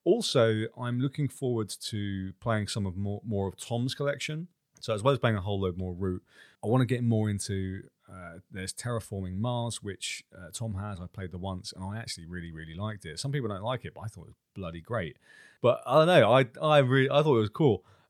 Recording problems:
none

